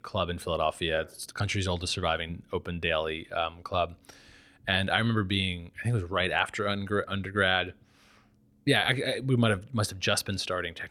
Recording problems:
none

